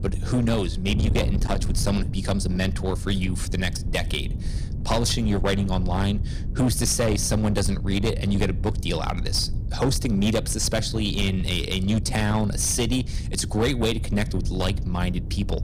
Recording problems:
distortion; slight; 10% of the sound clipped
wind noise on the microphone; occasional gusts; 15 dB below the speech

